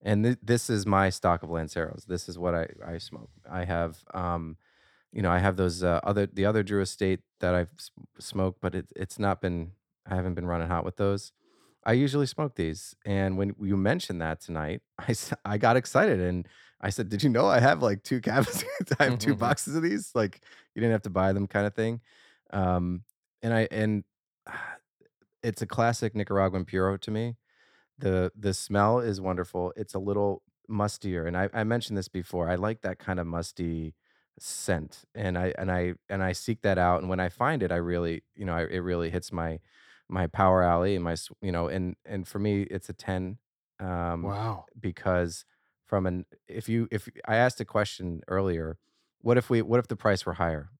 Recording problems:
none

